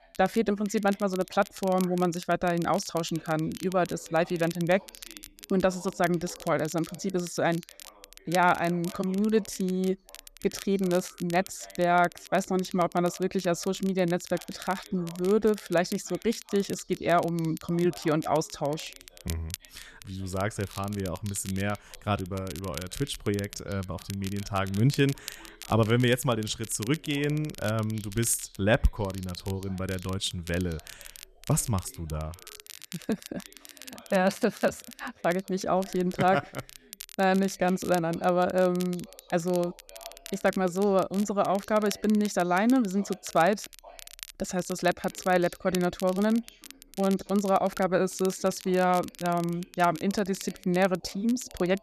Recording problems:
crackle, like an old record; noticeable; 15 dB below the speech
voice in the background; faint; throughout; 25 dB below the speech

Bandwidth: 13.5 kHz